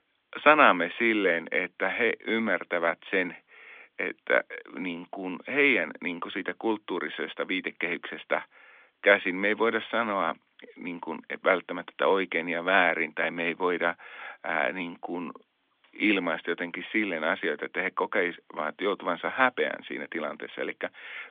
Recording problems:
phone-call audio; nothing above 3.5 kHz

